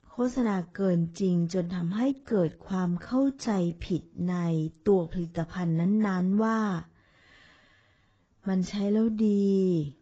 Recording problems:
garbled, watery; badly; nothing above 7.5 kHz
wrong speed, natural pitch; too slow; 0.6 times normal speed

